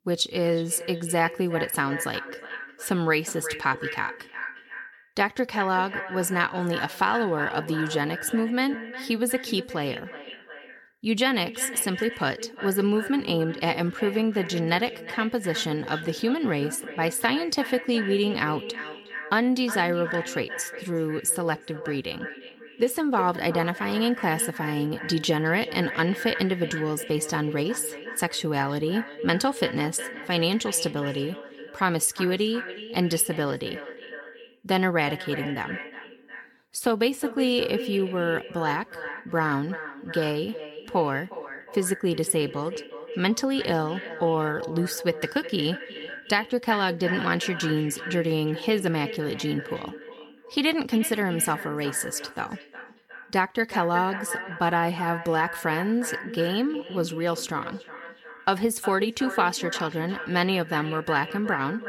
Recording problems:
echo of what is said; strong; throughout; 360 ms later, 10 dB below the speech

